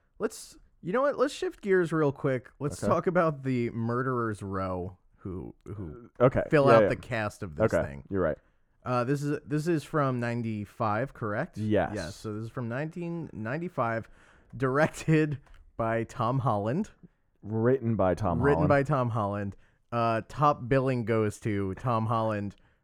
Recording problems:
muffled; slightly; fading above 2 kHz

